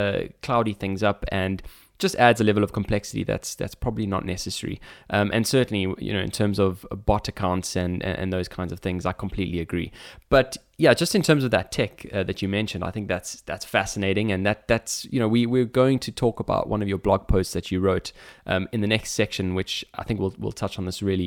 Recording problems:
abrupt cut into speech; at the start and the end

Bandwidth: 17 kHz